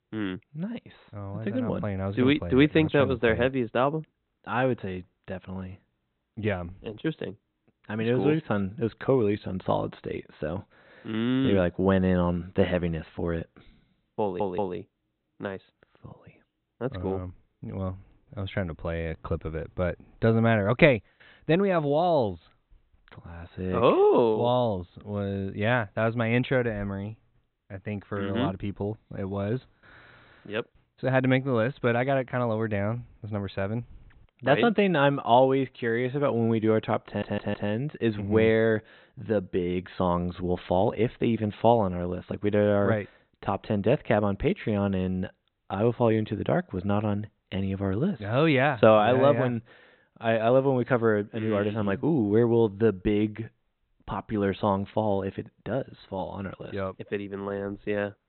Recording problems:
high frequencies cut off; severe; nothing above 4 kHz
audio stuttering; at 14 s and at 37 s

